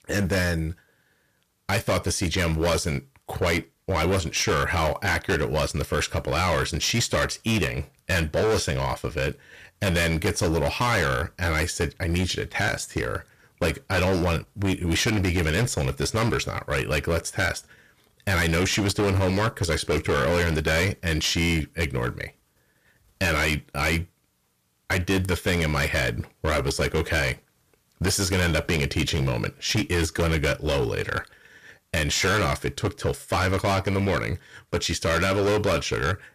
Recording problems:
distortion; heavy; 16% of the sound clipped

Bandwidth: 14.5 kHz